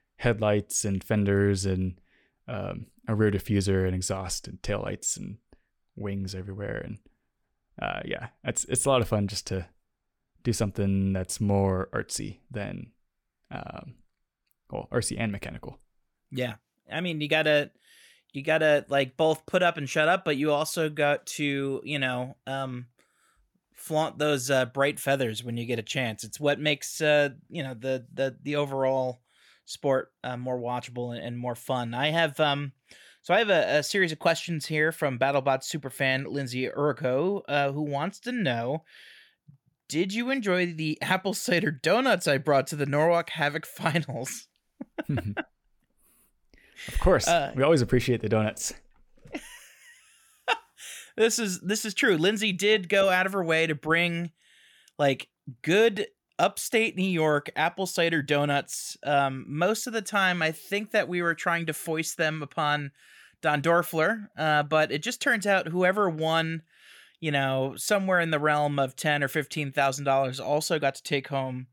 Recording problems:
none

